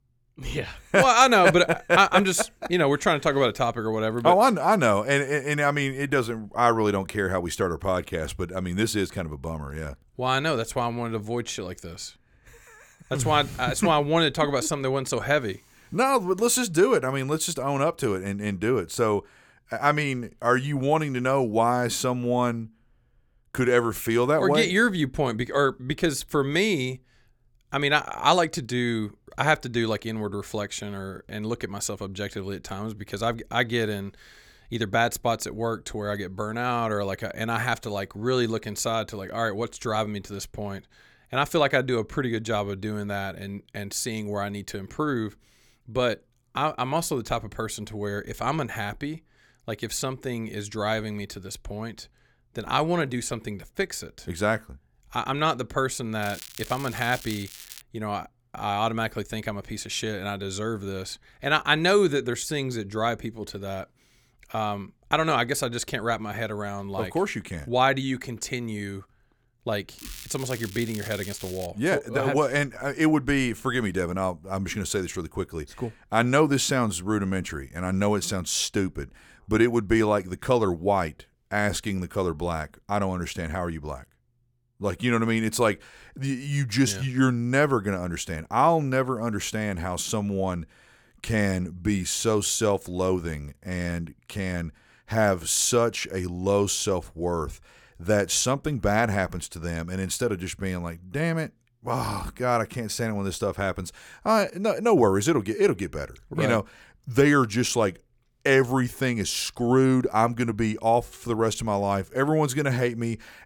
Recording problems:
crackling; noticeable; from 56 to 58 s and from 1:10 to 1:12; 15 dB below the speech

